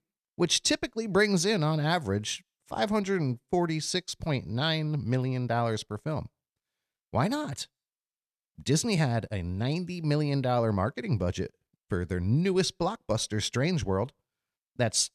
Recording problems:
none

